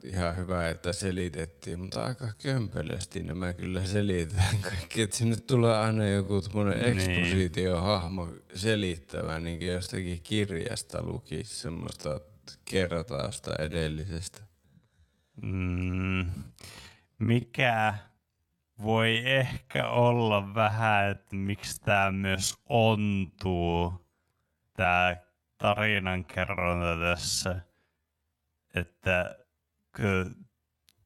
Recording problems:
wrong speed, natural pitch; too slow; 0.5 times normal speed

